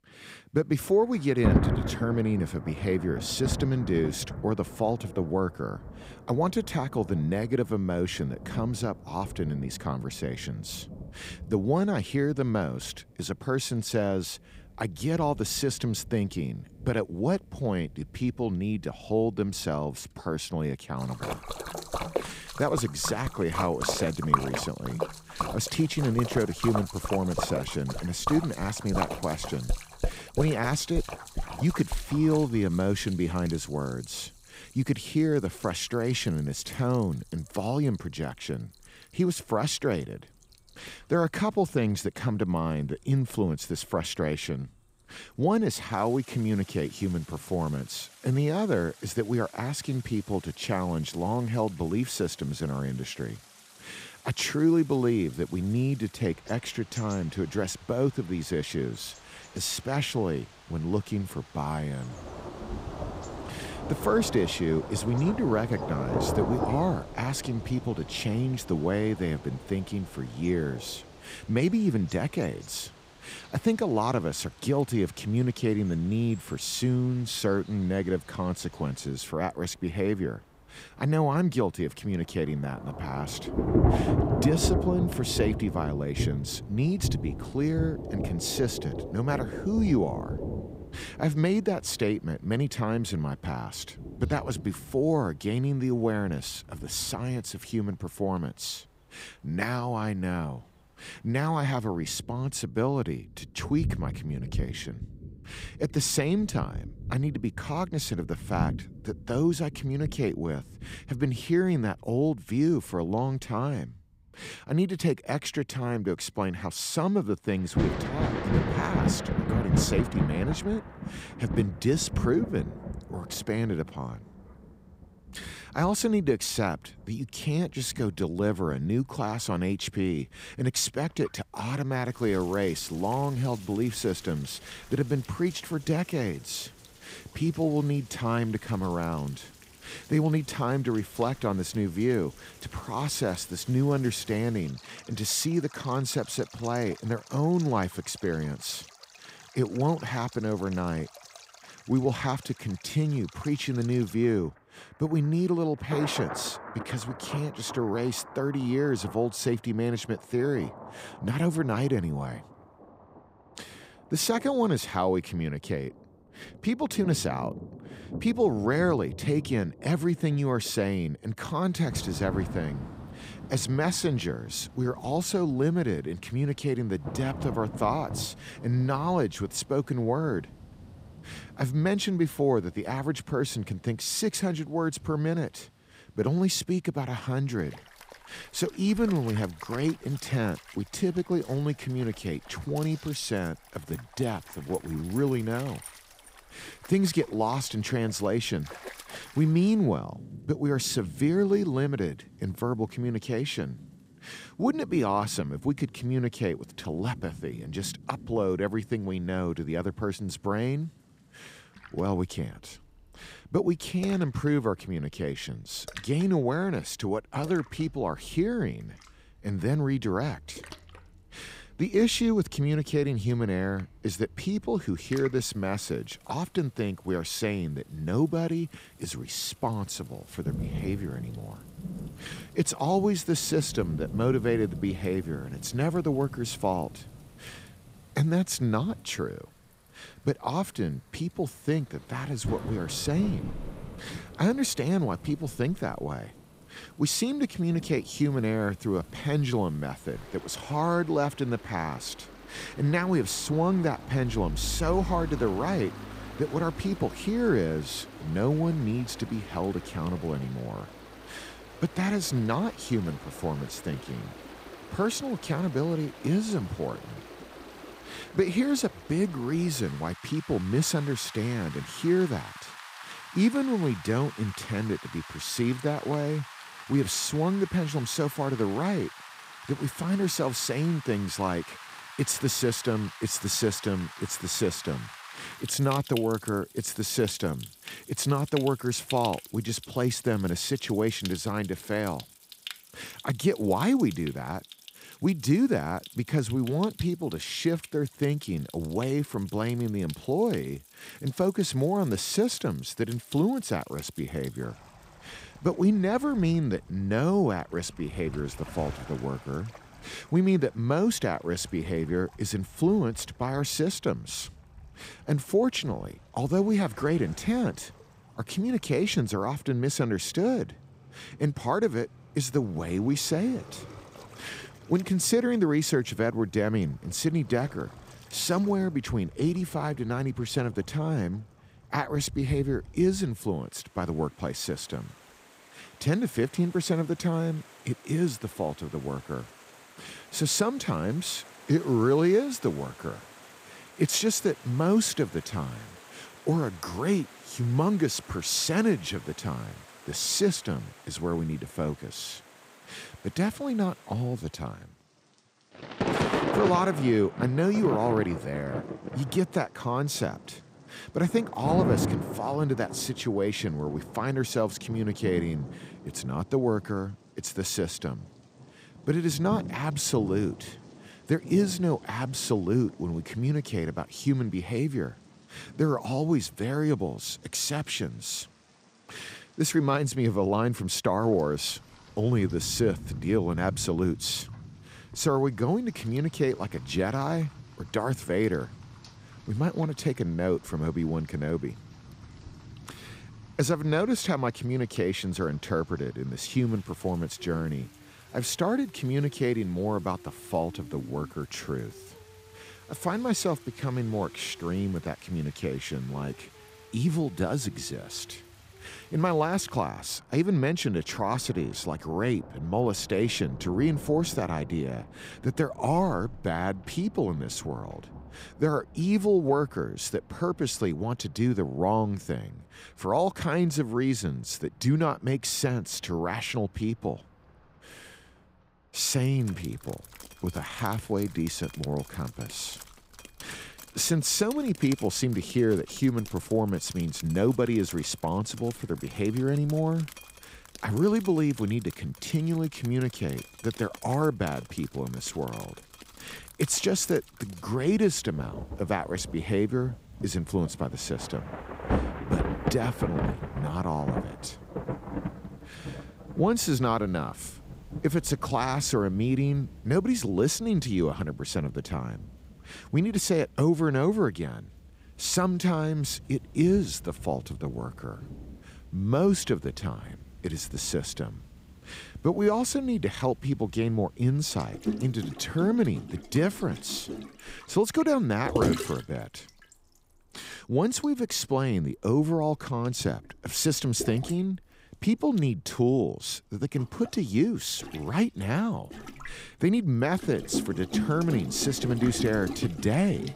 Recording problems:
rain or running water; noticeable; throughout; 10 dB below the speech

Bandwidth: 15.5 kHz